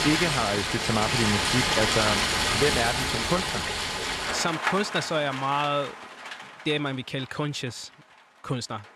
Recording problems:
rain or running water; very loud; throughout; 3 dB above the speech

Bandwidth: 14 kHz